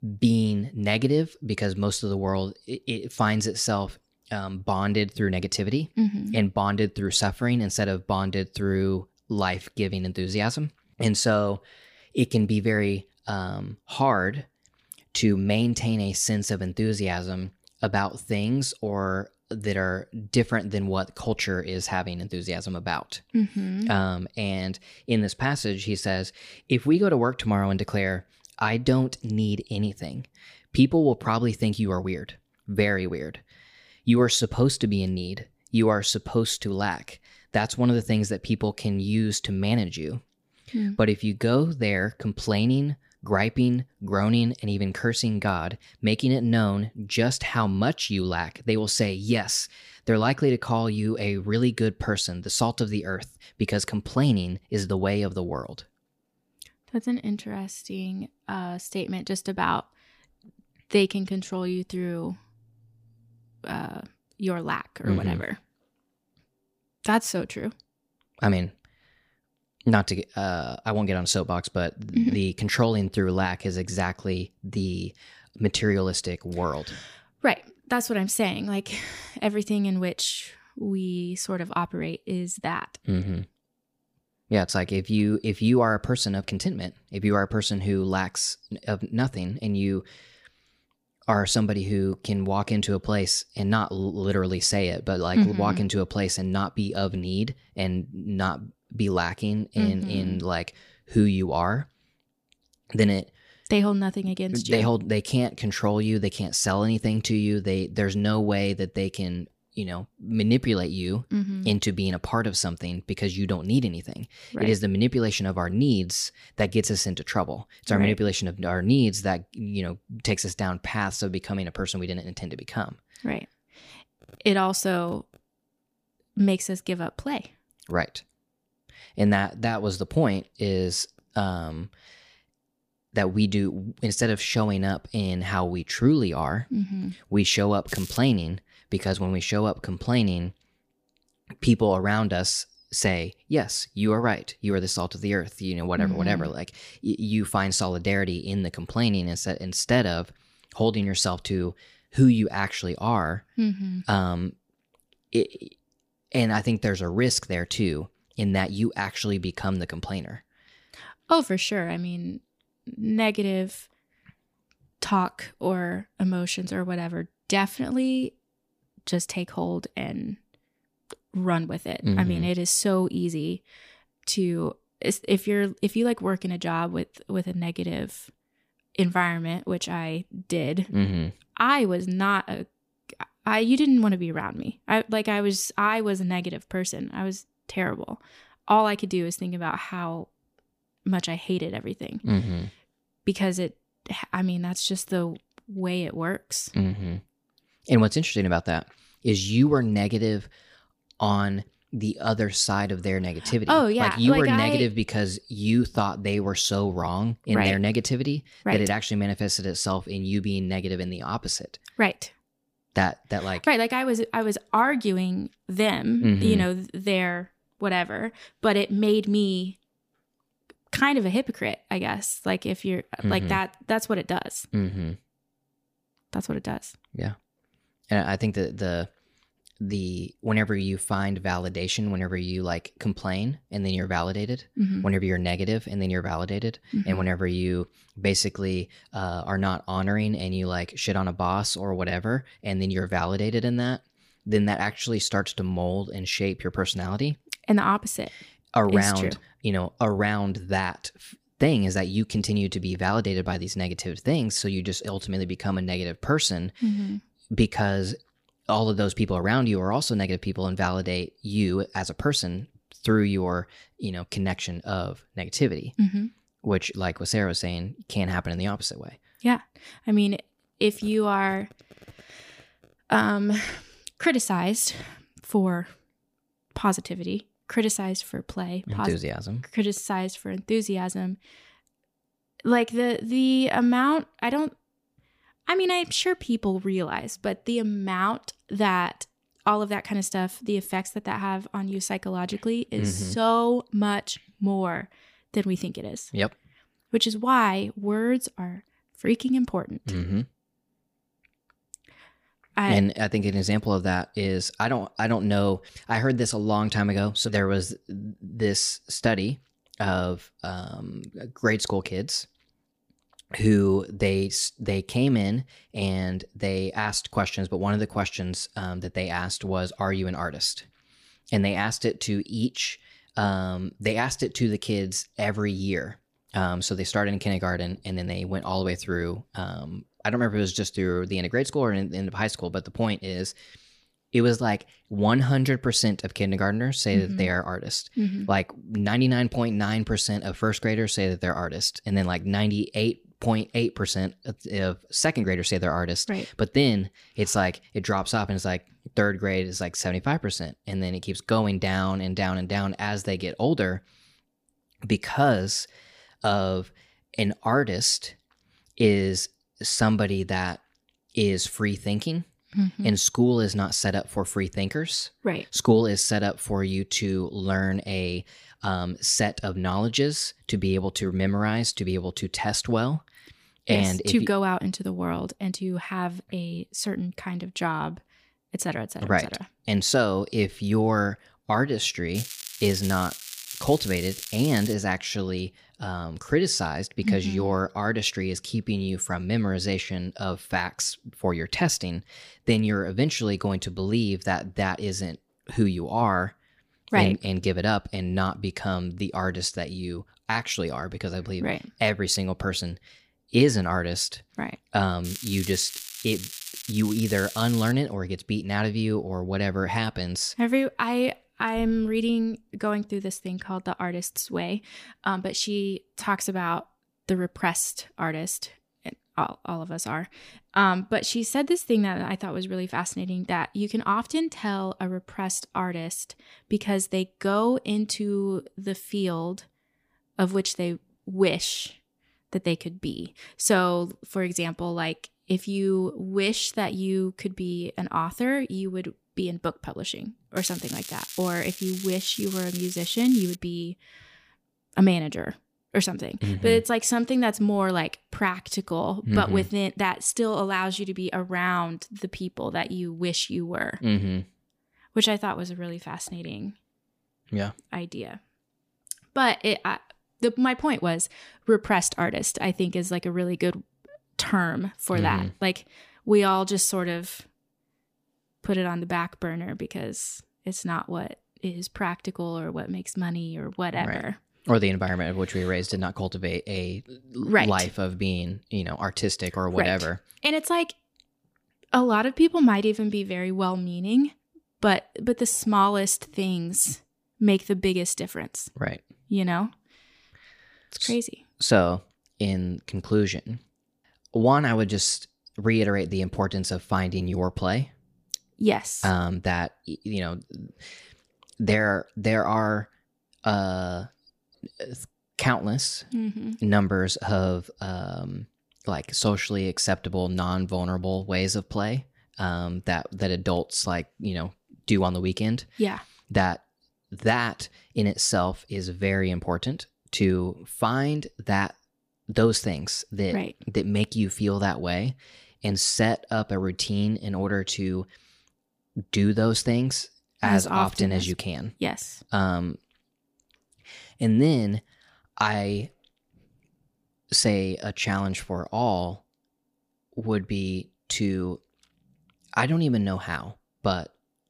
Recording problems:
crackling; noticeable; 4 times, first at 2:18; 10 dB below the speech

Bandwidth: 15 kHz